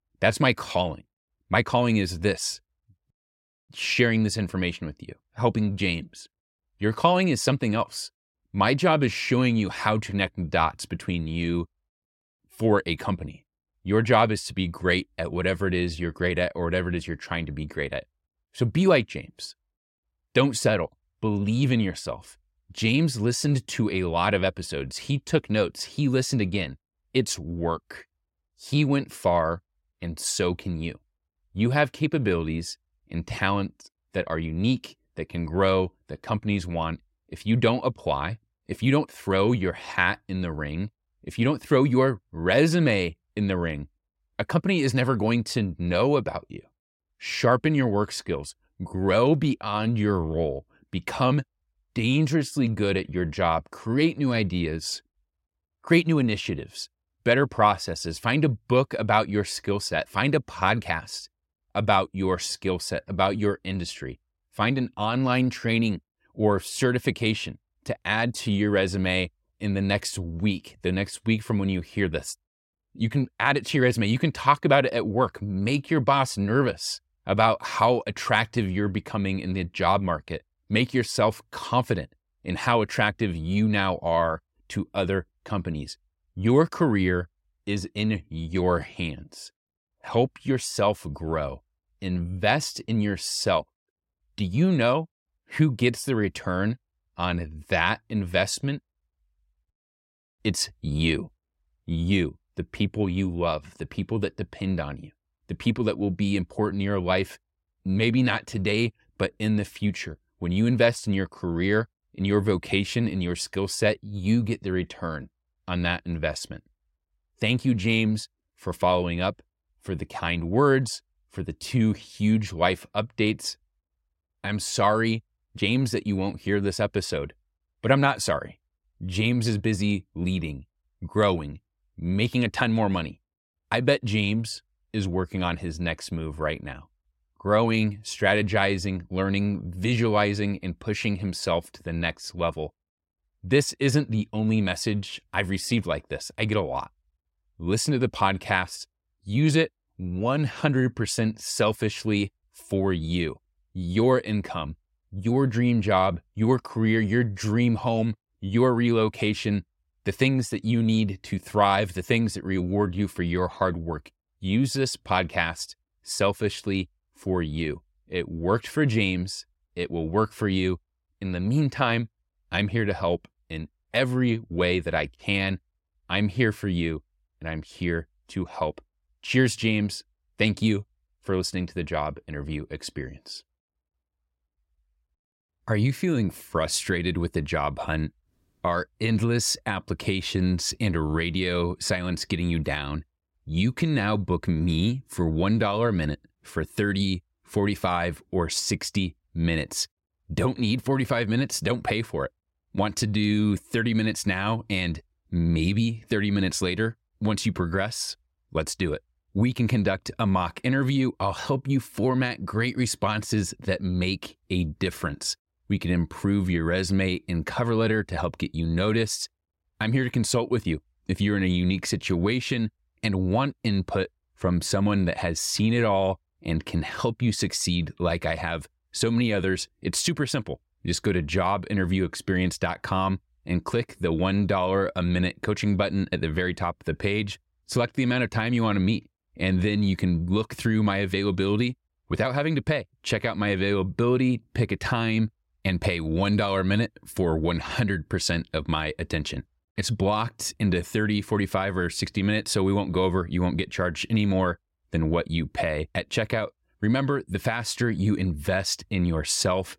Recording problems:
none

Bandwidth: 16 kHz